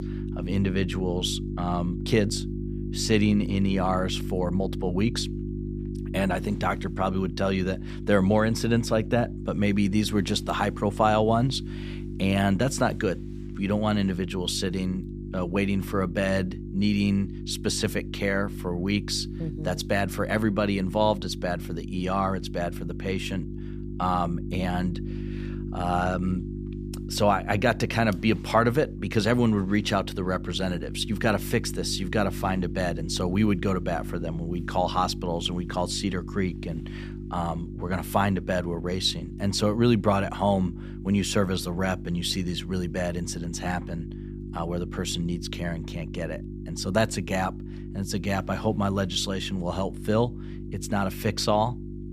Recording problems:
electrical hum; noticeable; throughout; 50 Hz, 15 dB below the speech

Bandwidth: 14.5 kHz